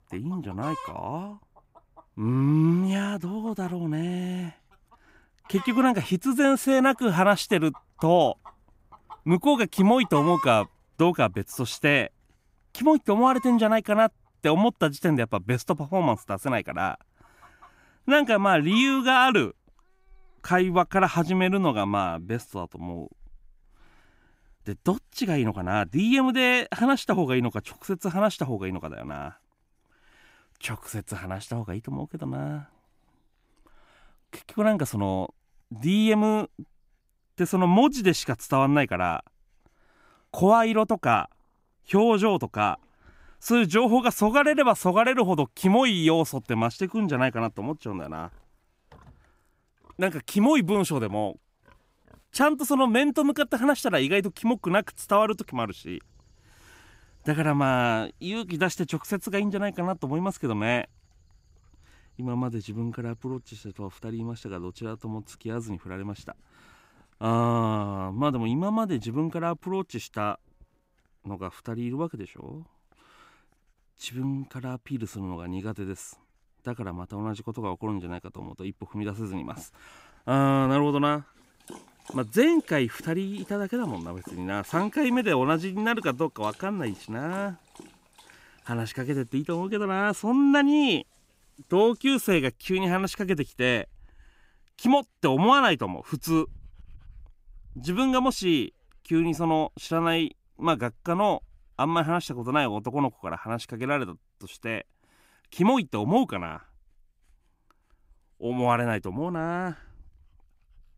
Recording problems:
animal sounds; faint; throughout; 20 dB below the speech

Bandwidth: 15.5 kHz